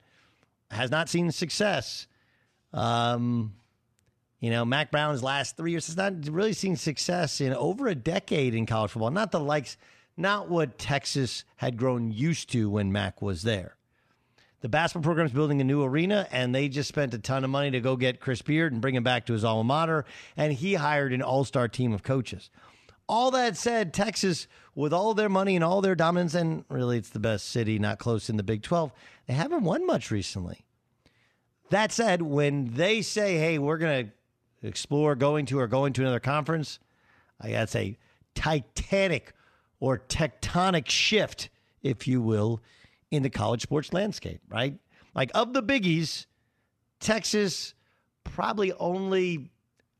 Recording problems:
uneven, jittery; strongly; from 0.5 to 49 s

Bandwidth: 13.5 kHz